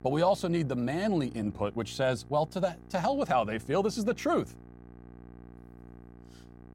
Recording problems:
electrical hum; faint; throughout; 60 Hz, 25 dB below the speech

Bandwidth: 16 kHz